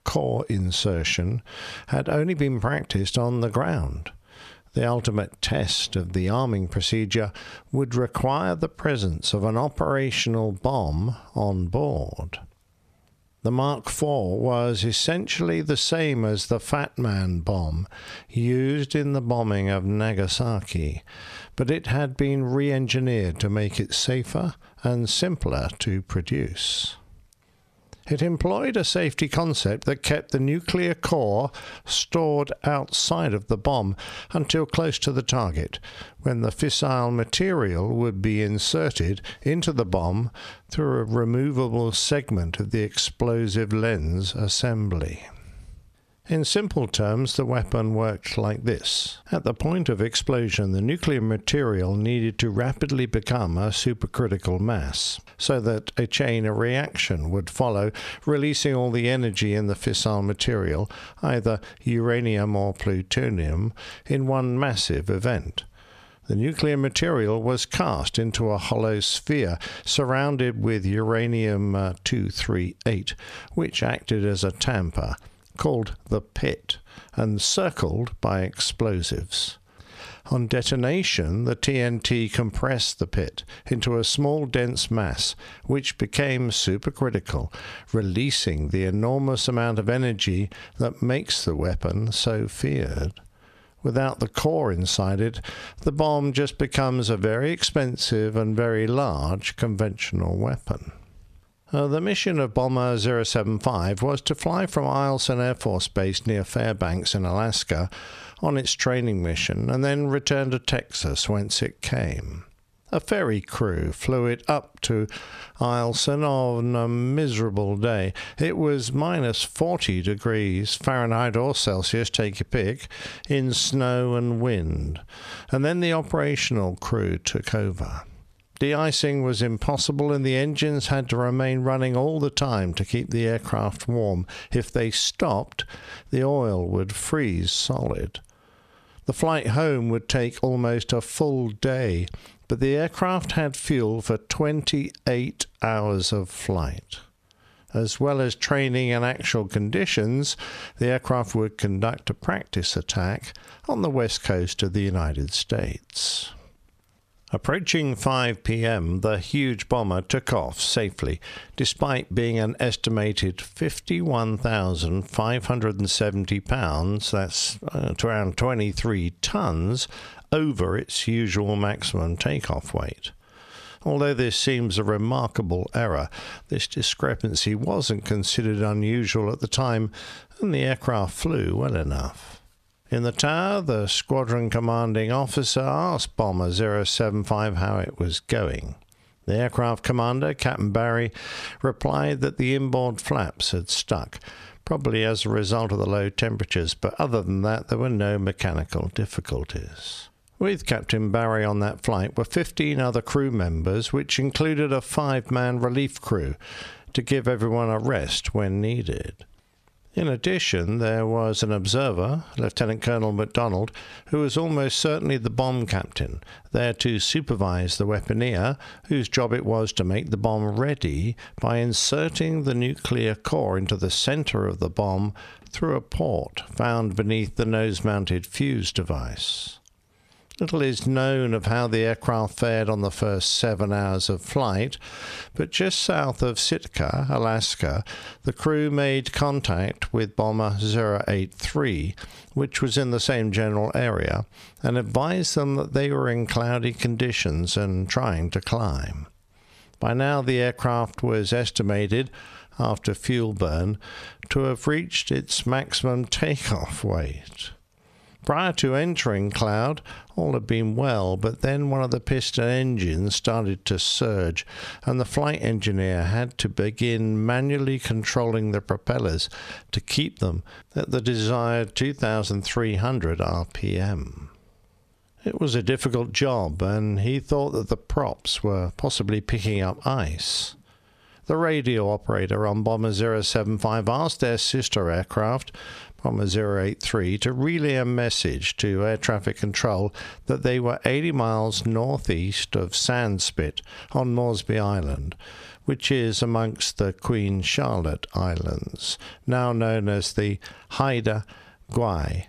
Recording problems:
squashed, flat; heavily

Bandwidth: 14 kHz